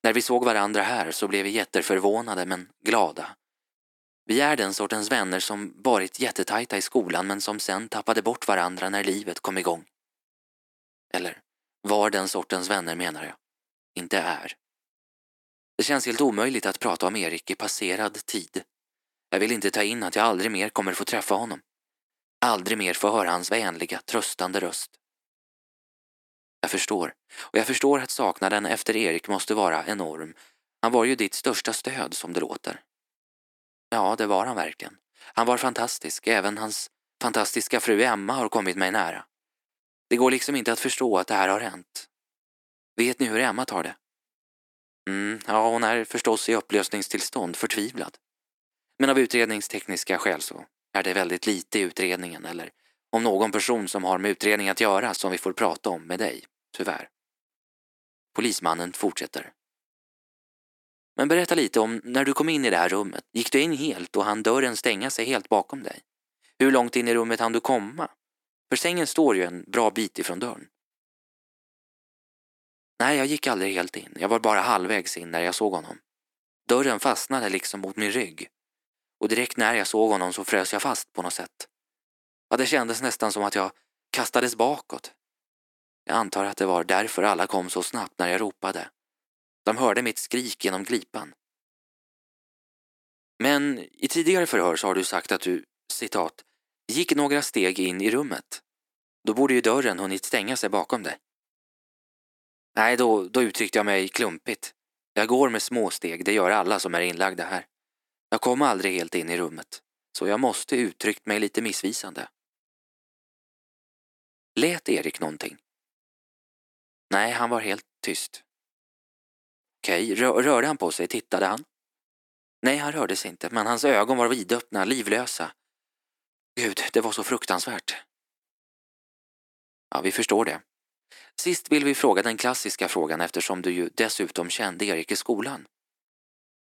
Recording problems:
thin; somewhat; fading below 300 Hz

